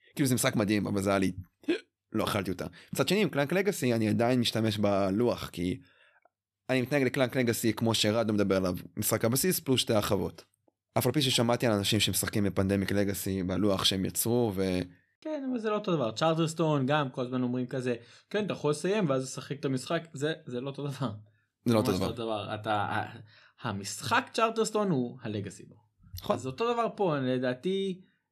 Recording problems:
none

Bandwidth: 13.5 kHz